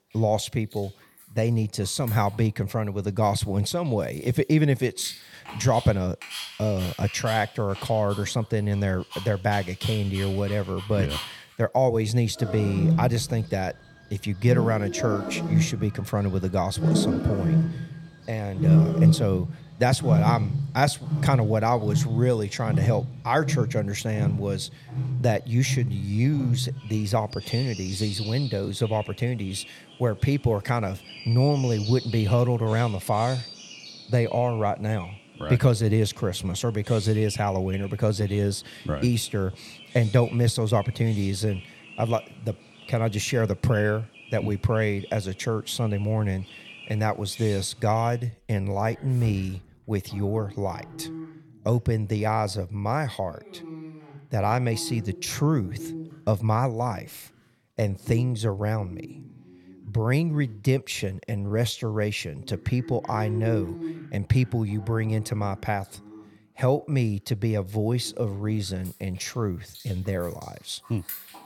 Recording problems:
animal sounds; loud; throughout; 4 dB below the speech

